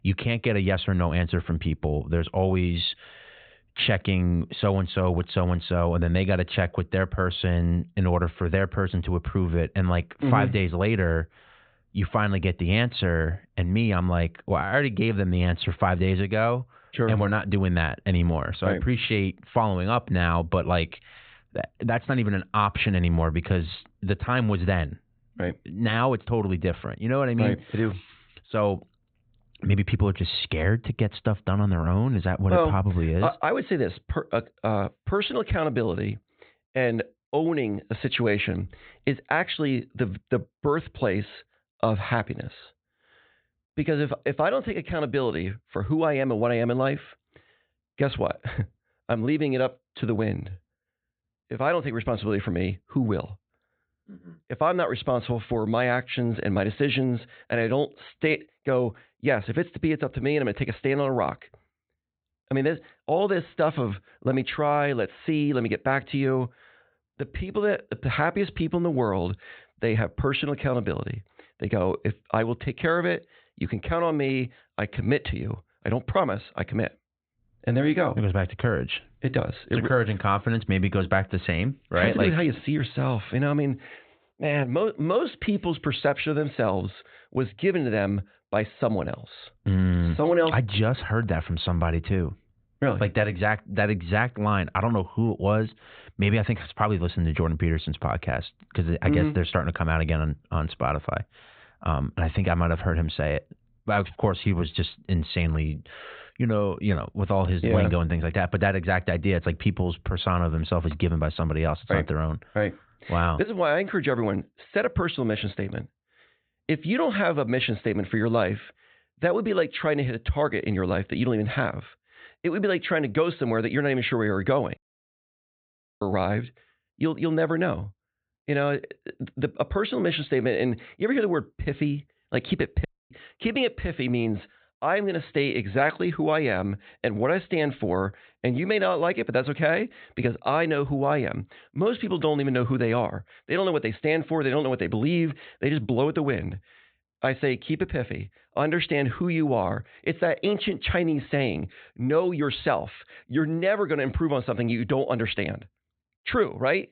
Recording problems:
high frequencies cut off; severe; nothing above 4 kHz
audio cutting out; at 2:05 for 1 s and at 2:13

